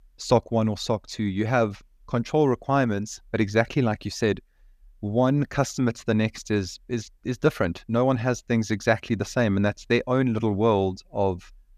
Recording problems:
none

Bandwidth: 14.5 kHz